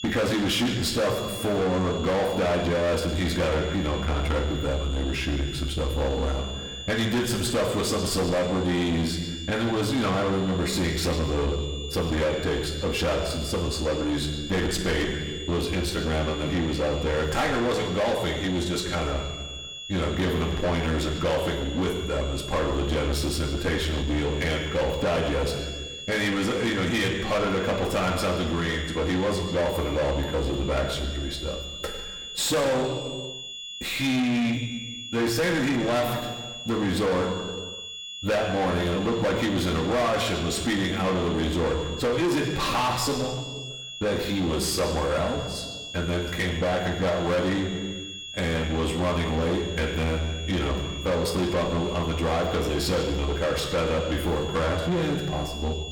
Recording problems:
distortion; heavy; 7 dB below the speech
room echo; noticeable; dies away in 1.1 s
off-mic speech; somewhat distant
high-pitched whine; noticeable; throughout; 3.5 kHz, 10 dB below the speech

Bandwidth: 18 kHz